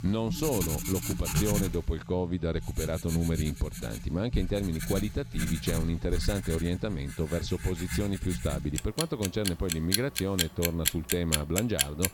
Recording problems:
household noises; loud; throughout; 2 dB below the speech

